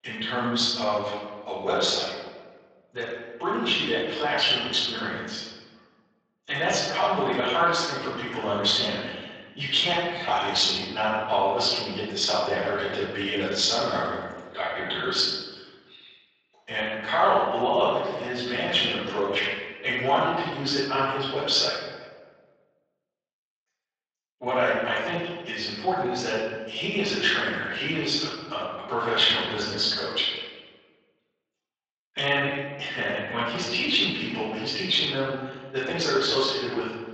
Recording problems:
room echo; strong; dies away in 1.3 s
off-mic speech; far
thin; somewhat; fading below 900 Hz
garbled, watery; slightly

